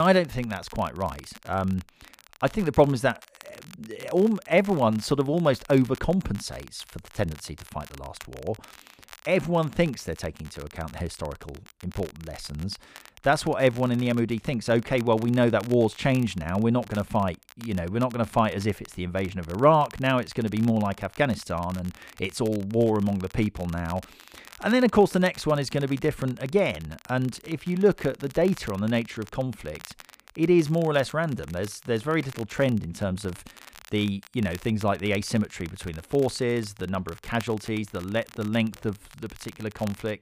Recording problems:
crackle, like an old record; faint; 20 dB below the speech
abrupt cut into speech; at the start

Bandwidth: 15 kHz